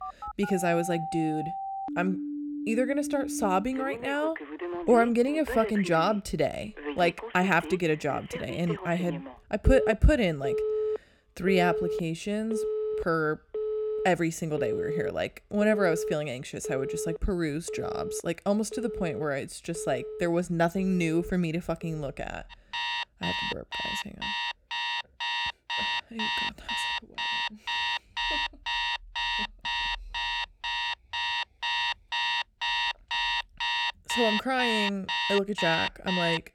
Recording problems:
alarms or sirens; loud; throughout; 3 dB below the speech

